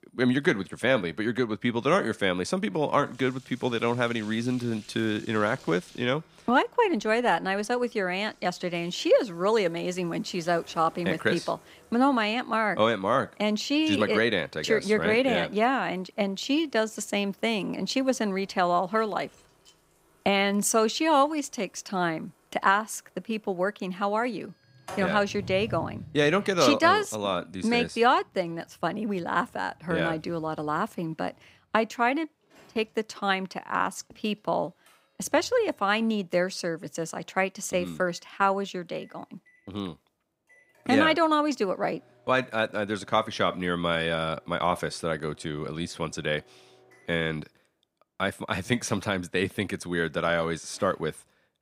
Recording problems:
household noises; faint; throughout; 25 dB below the speech

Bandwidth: 15.5 kHz